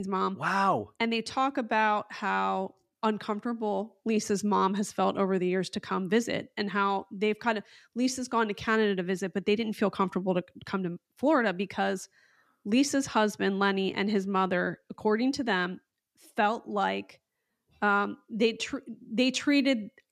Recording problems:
abrupt cut into speech; at the start

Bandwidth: 14.5 kHz